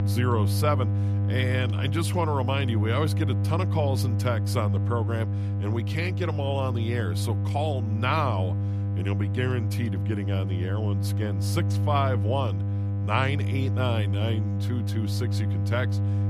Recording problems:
electrical hum; loud; throughout; 50 Hz, 8 dB below the speech

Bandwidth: 14.5 kHz